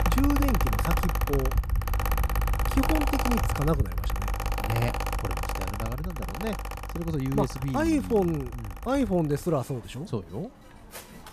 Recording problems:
machinery noise; loud; throughout; 1 dB below the speech

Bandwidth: 14.5 kHz